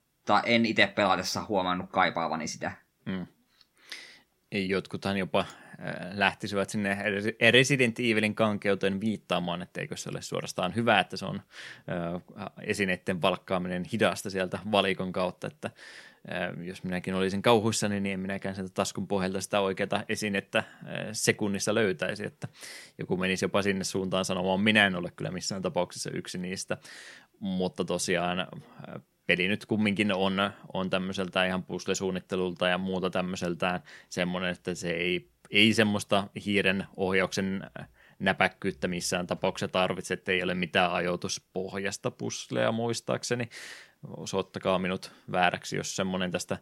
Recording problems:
none

